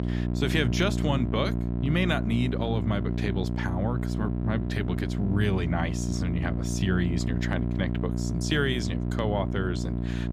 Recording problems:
electrical hum; loud; throughout; 60 Hz, 6 dB below the speech

